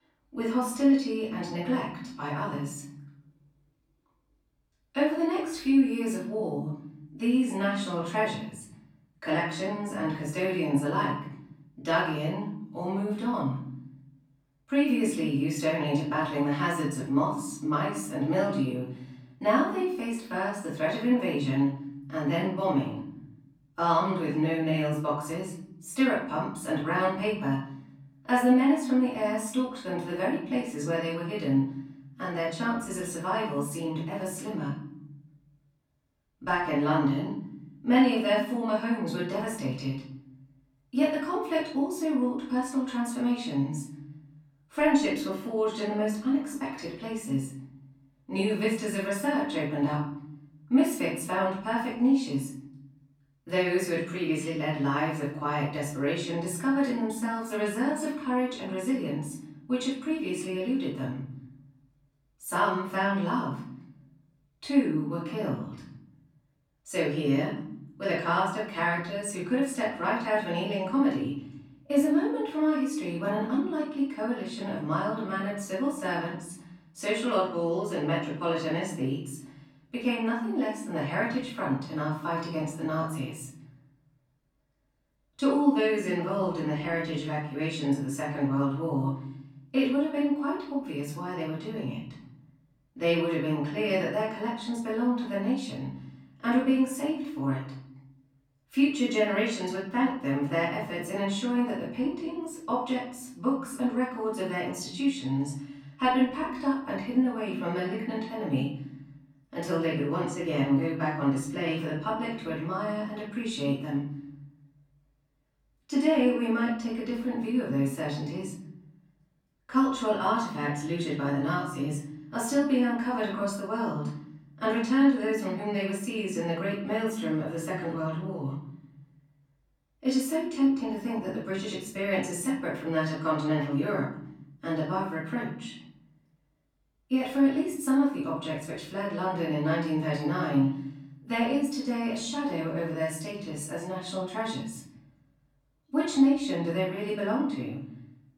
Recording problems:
off-mic speech; far
room echo; noticeable; dies away in 0.9 s

